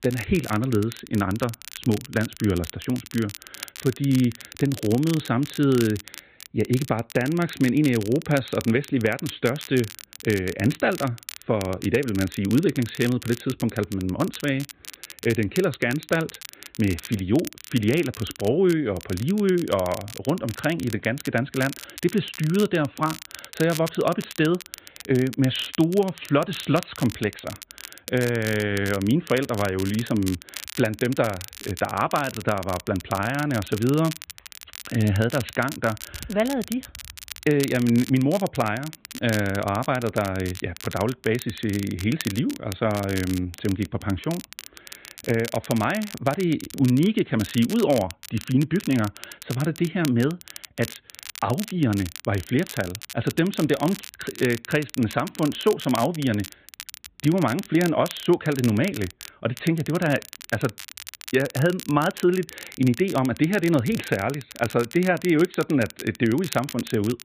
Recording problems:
high frequencies cut off; severe; nothing above 4 kHz
crackle, like an old record; noticeable; 15 dB below the speech

